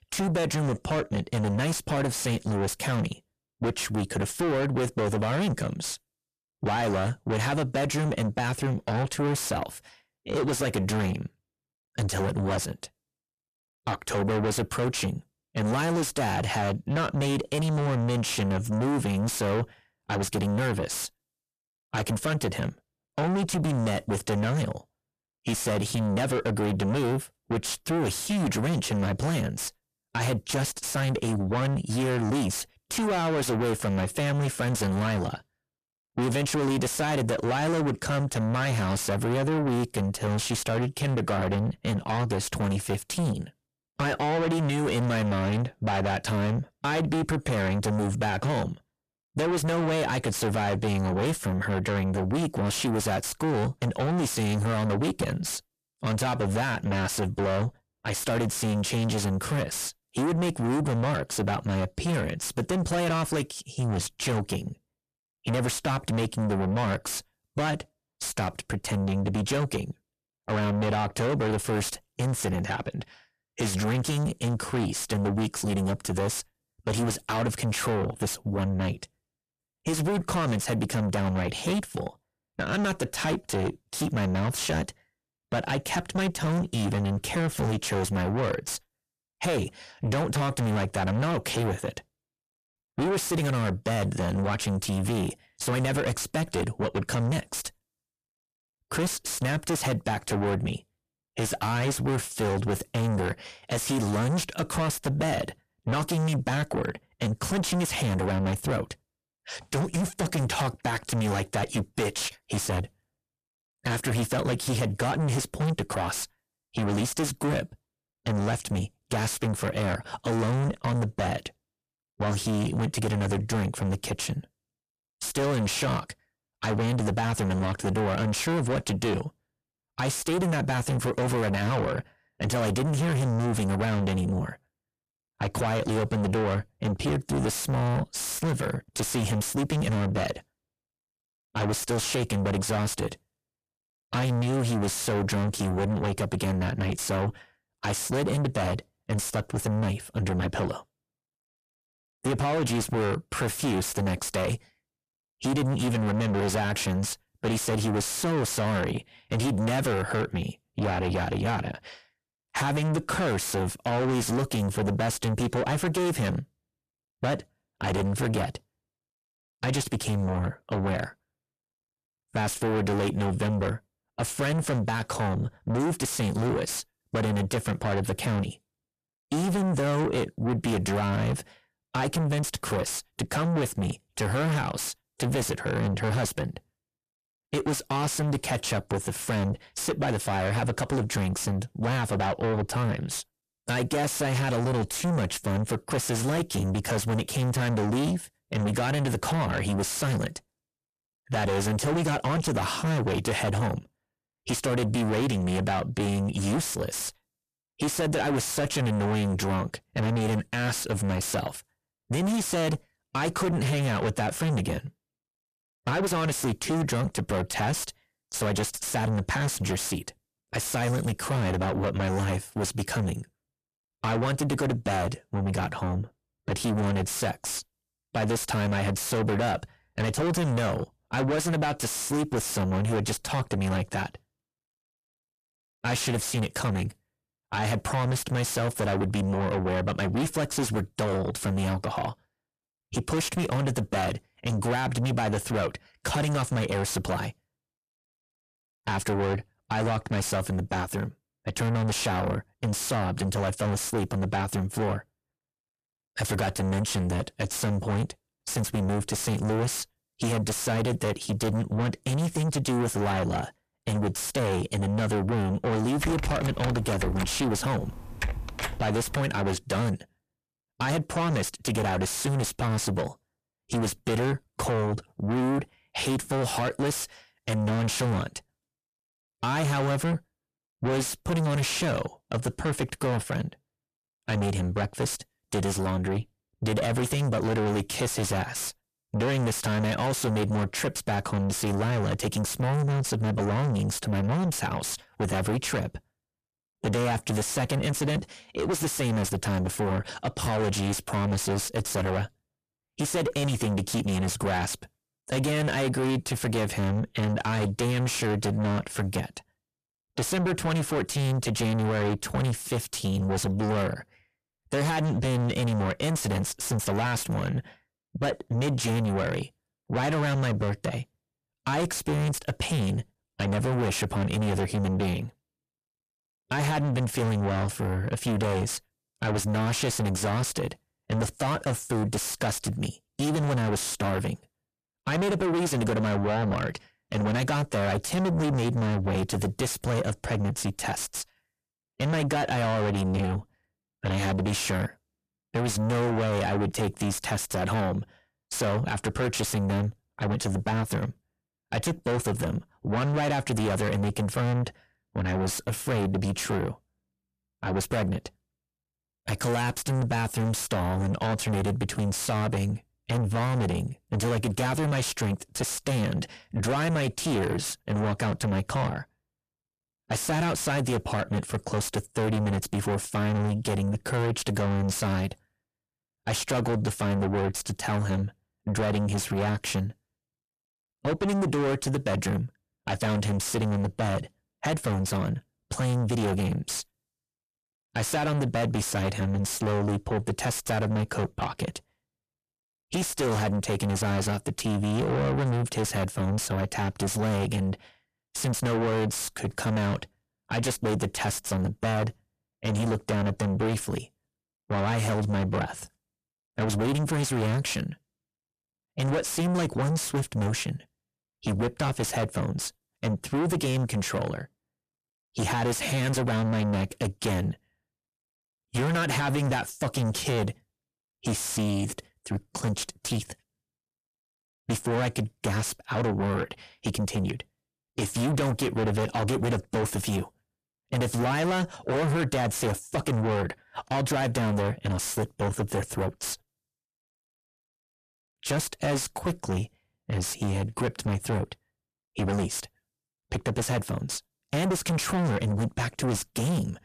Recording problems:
distortion; heavy; 5 dB below the speech
keyboard typing; noticeable; from 4:26 to 4:29; peak 3 dB below the speech

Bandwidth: 14.5 kHz